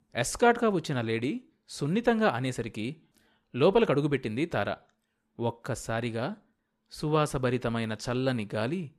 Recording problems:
none

